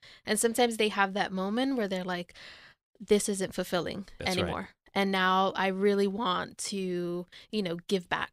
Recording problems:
none

